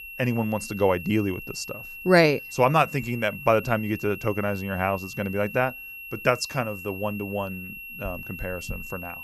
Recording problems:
high-pitched whine; noticeable; throughout; 2.5 kHz, 10 dB below the speech

